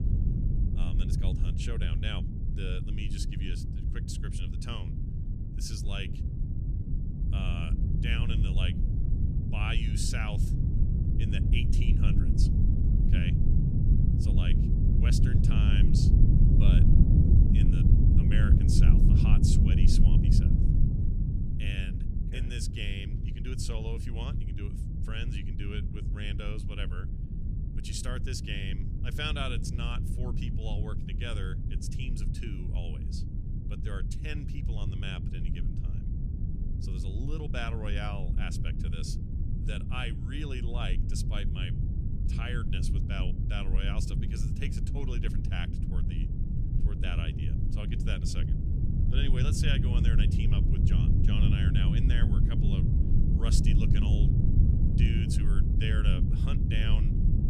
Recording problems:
low rumble; loud; throughout; 1 dB below the speech

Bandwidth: 14.5 kHz